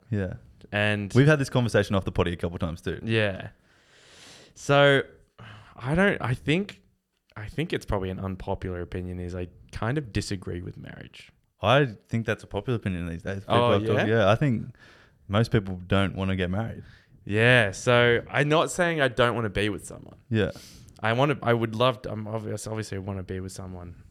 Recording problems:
none

